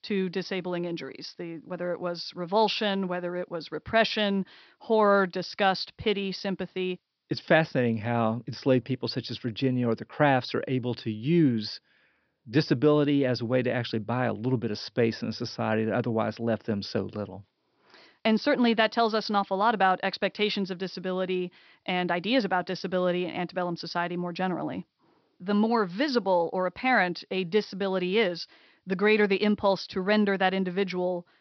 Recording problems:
high frequencies cut off; noticeable; nothing above 5.5 kHz

